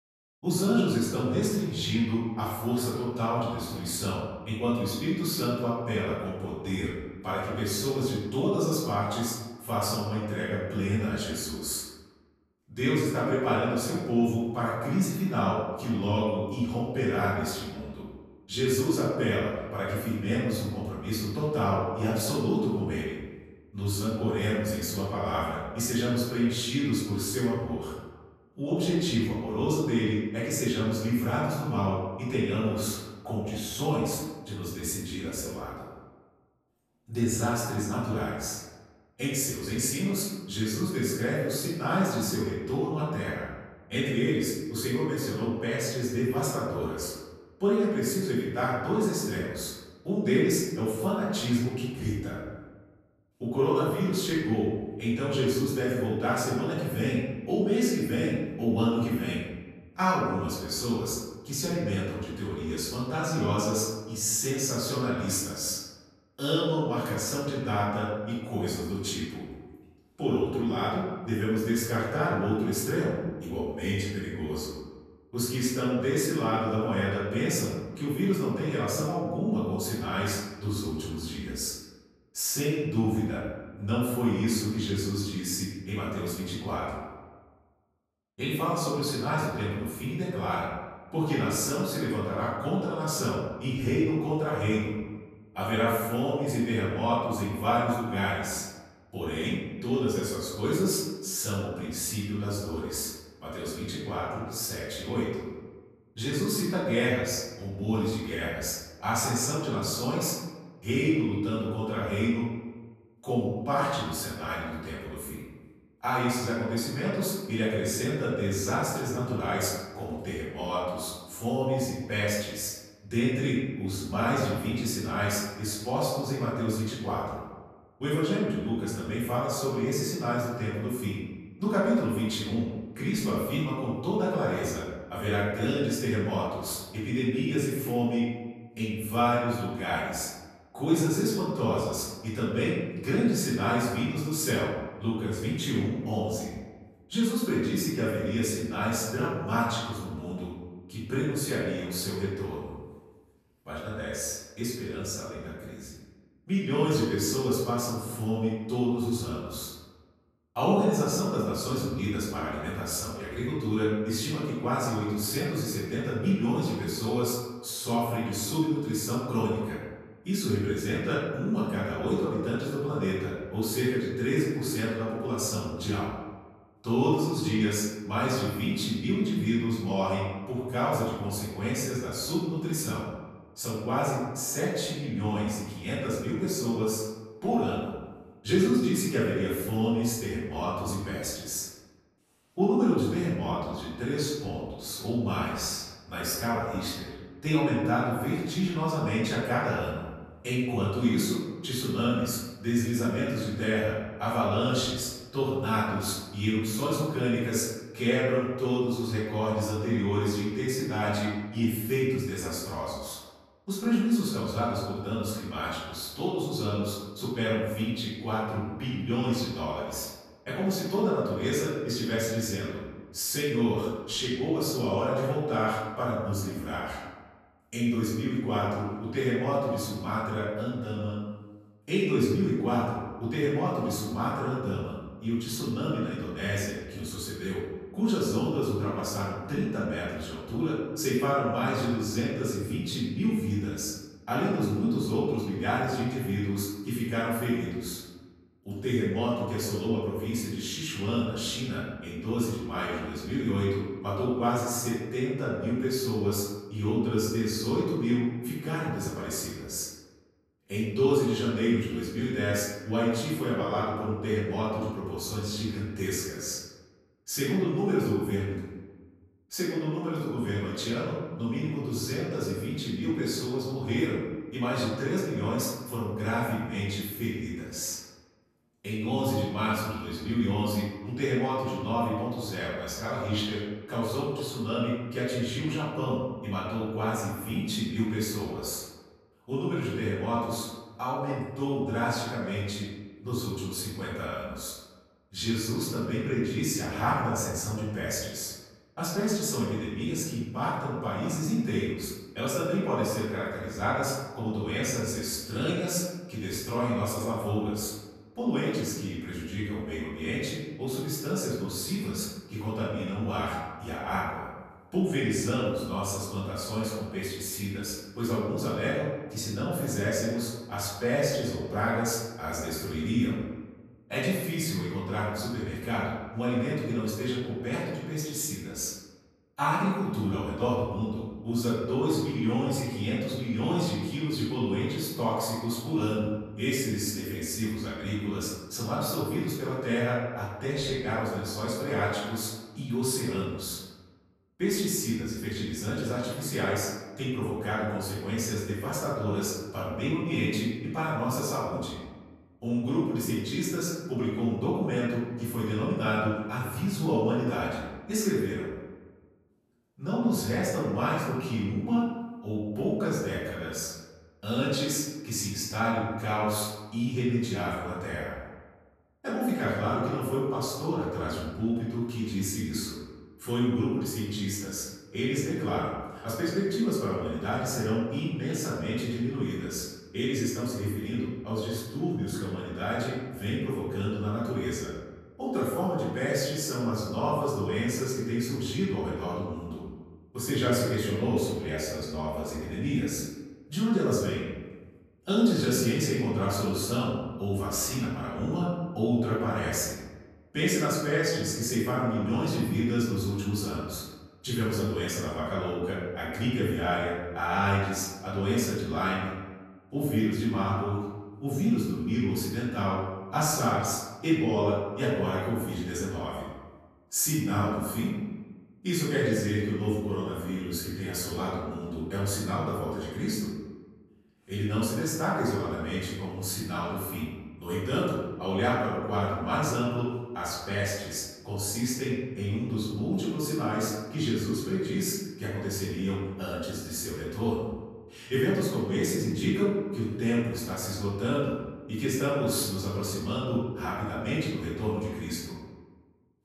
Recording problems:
off-mic speech; far
room echo; noticeable; dies away in 1.1 s

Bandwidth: 14 kHz